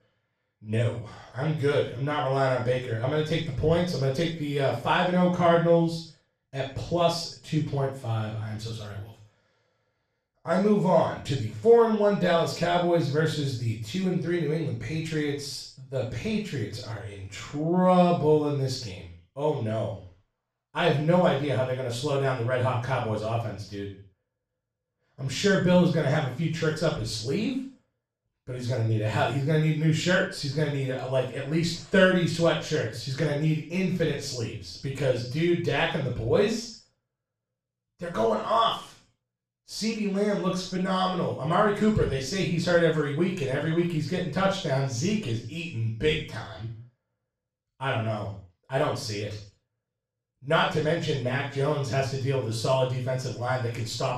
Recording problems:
room echo; strong; dies away in 0.4 s
off-mic speech; far

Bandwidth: 14.5 kHz